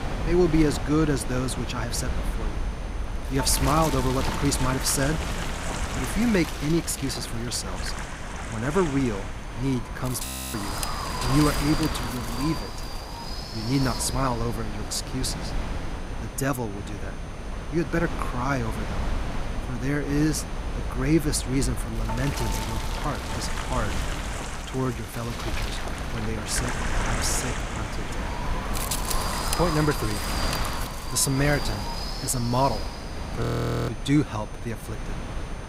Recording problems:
wind noise on the microphone; heavy; 4 dB below the speech
high-pitched whine; faint; throughout; 6 kHz, 25 dB below the speech
audio freezing; at 10 s and at 33 s

